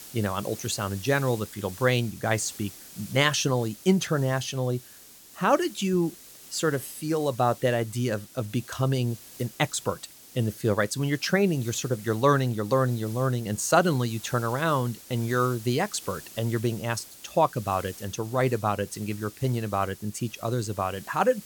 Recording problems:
hiss; noticeable; throughout; 15 dB below the speech

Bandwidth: 18 kHz